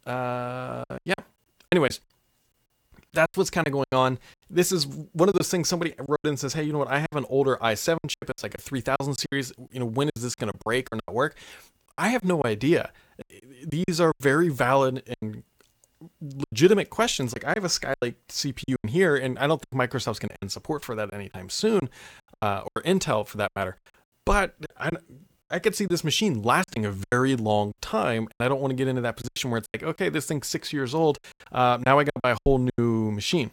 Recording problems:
choppy; very; 12% of the speech affected

